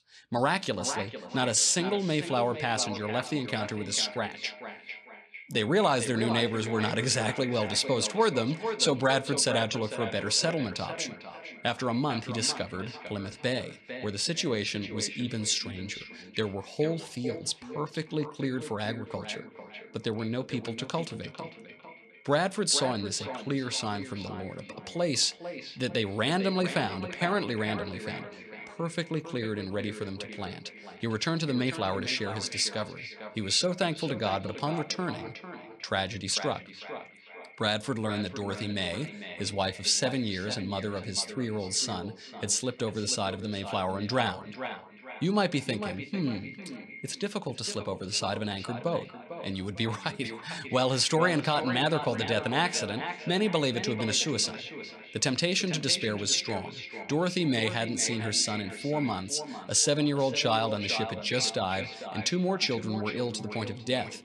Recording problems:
echo of what is said; strong; throughout; 450 ms later, 10 dB below the speech

